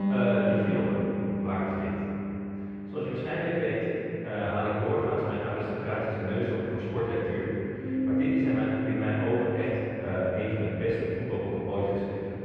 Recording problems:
room echo; strong; dies away in 3 s
off-mic speech; far
muffled; very; fading above 2 kHz
background music; loud; throughout; 2 dB below the speech

